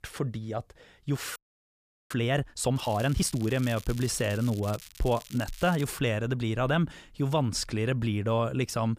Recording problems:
crackling; noticeable; from 3 to 6 s; 15 dB below the speech
audio freezing; at 1.5 s for 0.5 s

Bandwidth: 15 kHz